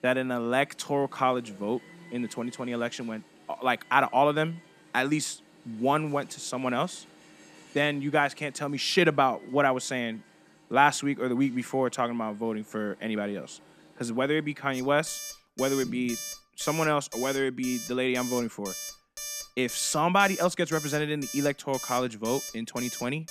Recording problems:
alarms or sirens; noticeable; throughout; 10 dB below the speech

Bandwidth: 14.5 kHz